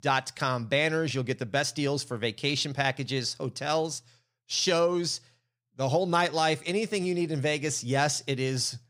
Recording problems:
none

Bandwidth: 15.5 kHz